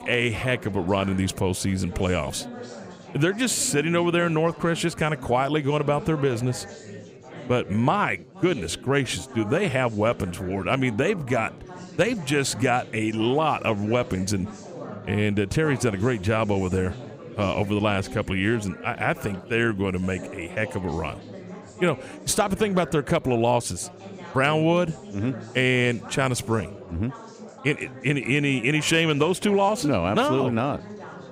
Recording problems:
chatter from many people; noticeable; throughout; 15 dB below the speech

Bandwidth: 15.5 kHz